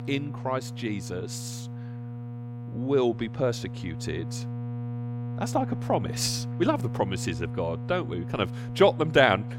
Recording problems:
electrical hum; noticeable; throughout; 60 Hz, 15 dB below the speech

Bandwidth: 16.5 kHz